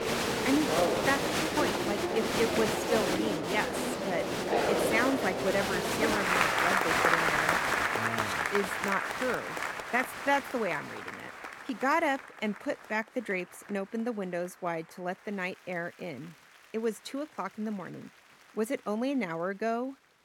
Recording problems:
crowd noise; very loud; throughout; 4 dB above the speech

